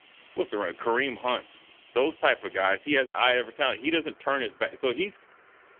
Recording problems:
phone-call audio; poor line; nothing above 3.5 kHz
traffic noise; faint; throughout; 25 dB below the speech
choppy; occasionally; 2% of the speech affected

